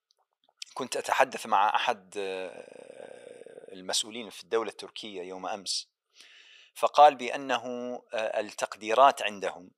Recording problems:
thin; very; fading below 850 Hz

